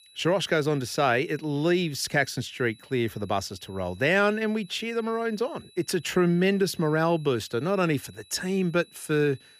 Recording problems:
high-pitched whine; faint; throughout; 4 kHz, 25 dB below the speech

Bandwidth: 15 kHz